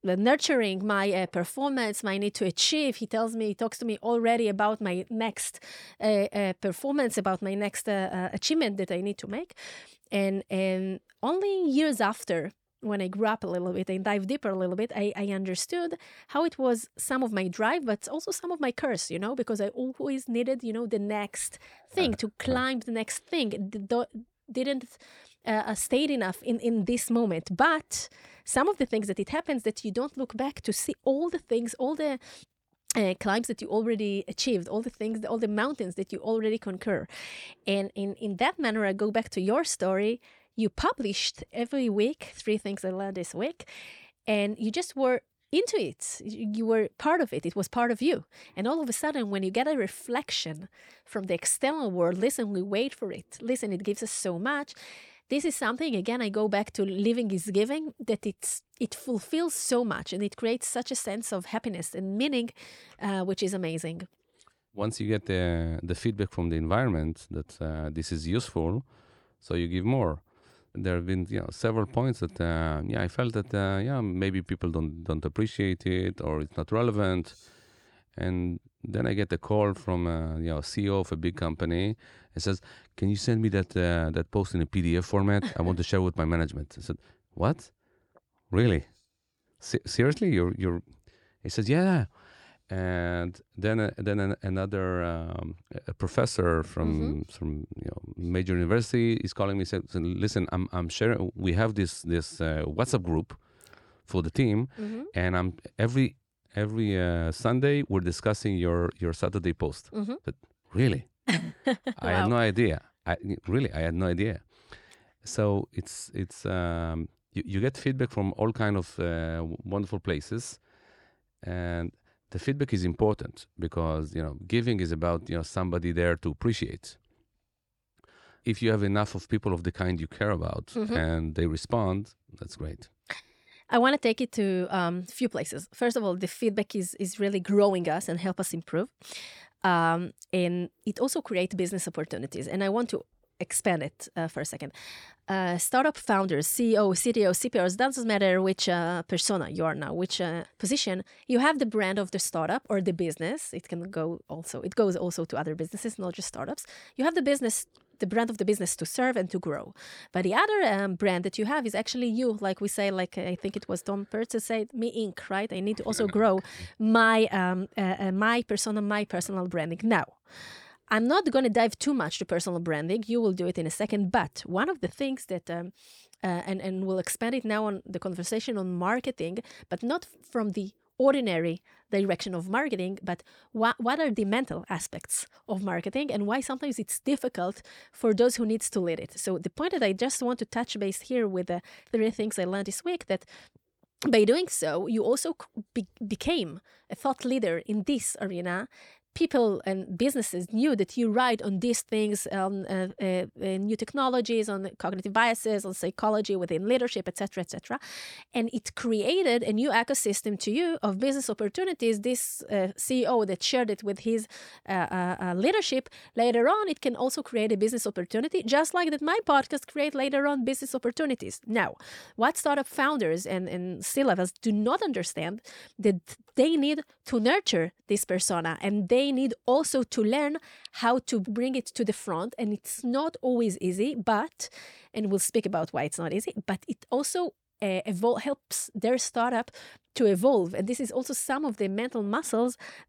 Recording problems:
none

